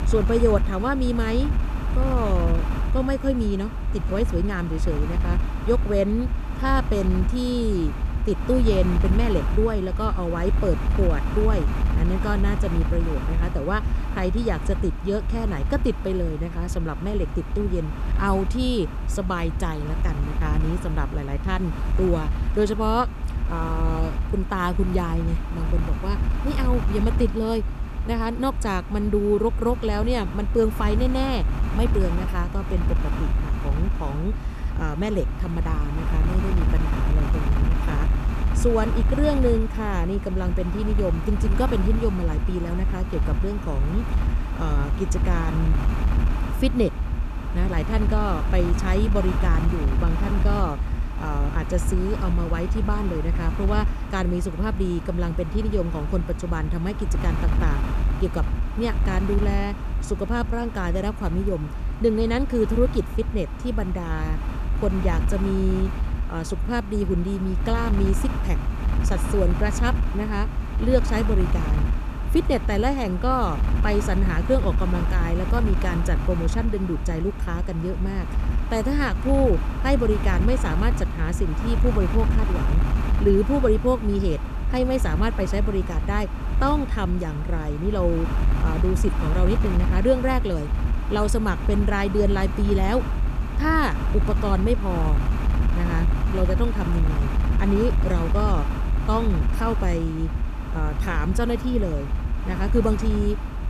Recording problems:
wind noise on the microphone; heavy; 8 dB below the speech

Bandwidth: 13.5 kHz